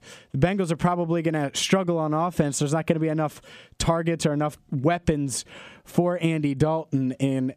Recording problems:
squashed, flat; heavily

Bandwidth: 14.5 kHz